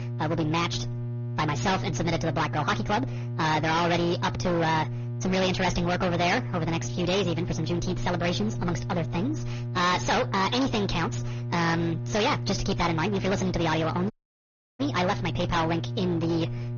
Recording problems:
distortion; heavy; 20% of the sound clipped
wrong speed and pitch; too fast and too high; 1.5 times normal speed
high frequencies cut off; noticeable; nothing above 6.5 kHz
garbled, watery; slightly
electrical hum; noticeable; throughout; 60 Hz, 15 dB below the speech
audio cutting out; at 14 s for 0.5 s

